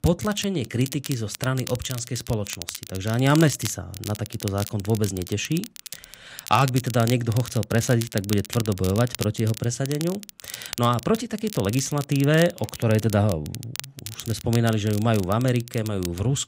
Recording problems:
crackle, like an old record; noticeable; 10 dB below the speech

